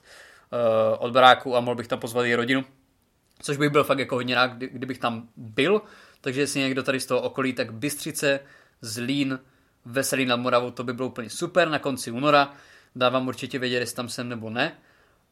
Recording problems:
none

